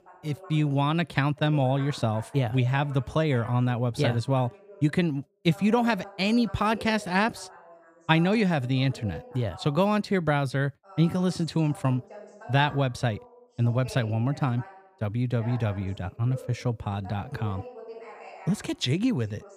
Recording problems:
voice in the background; noticeable; throughout; 20 dB below the speech

